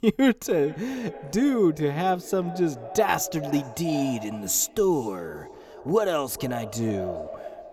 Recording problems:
echo of what is said; noticeable; throughout; 420 ms later, 15 dB below the speech

